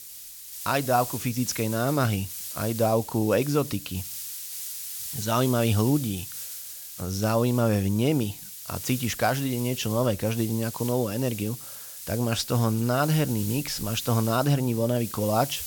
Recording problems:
hiss; loud; throughout; 9 dB below the speech

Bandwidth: 17.5 kHz